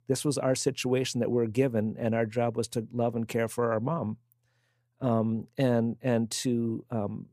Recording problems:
none

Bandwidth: 15 kHz